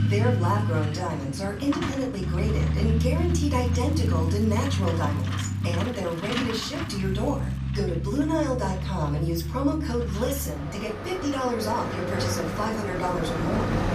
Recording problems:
off-mic speech; far
room echo; very slight; dies away in 0.4 s
traffic noise; very loud; throughout; as loud as the speech
crackling; faint; from 3 to 7.5 s; 25 dB below the speech

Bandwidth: 14.5 kHz